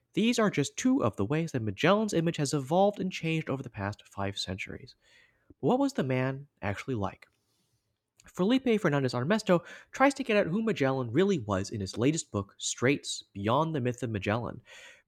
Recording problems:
none

